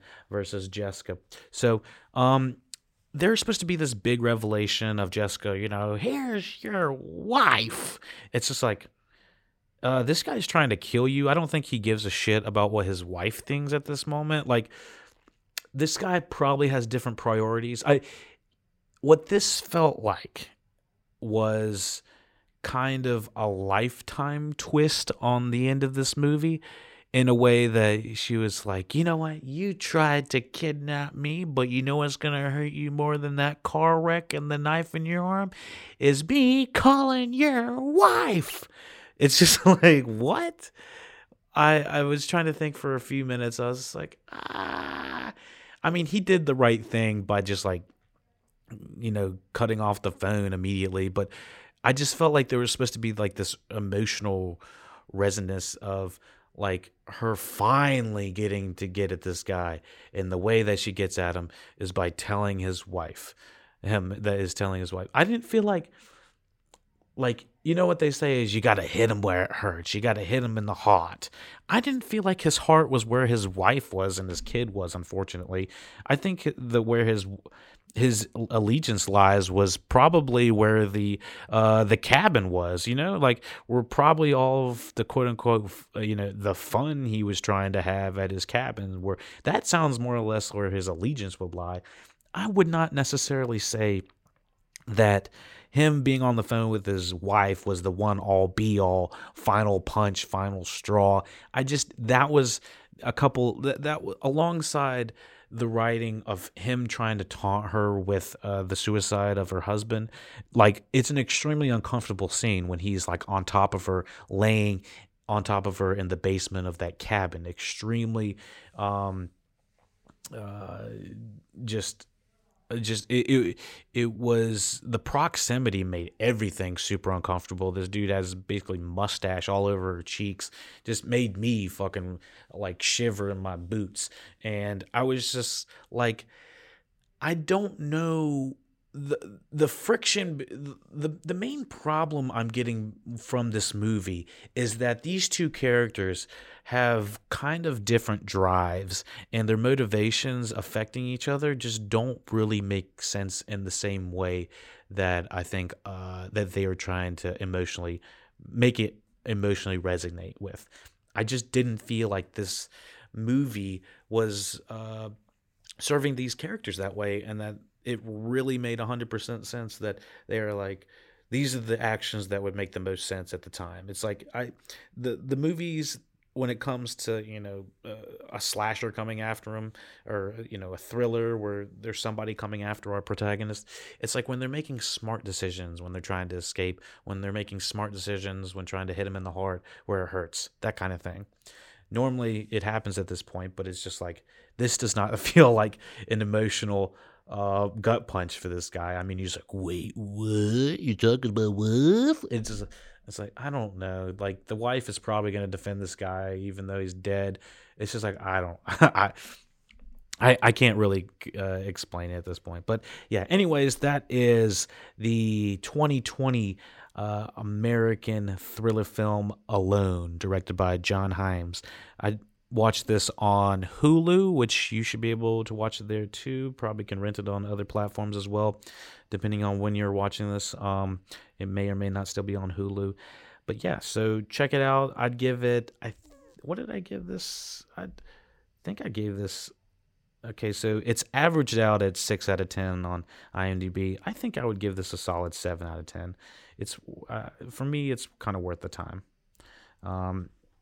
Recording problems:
none

